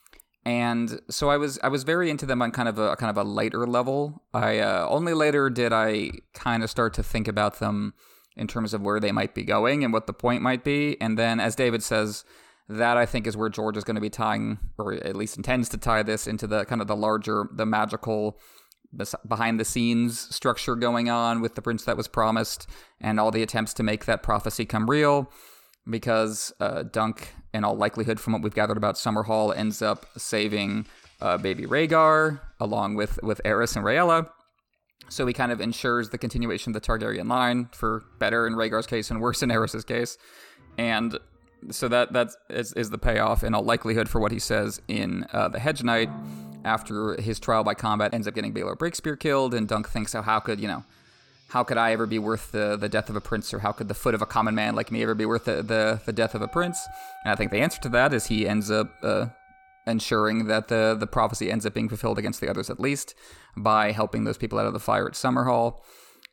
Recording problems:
background music; faint; from 28 s on; 25 dB below the speech

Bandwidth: 18 kHz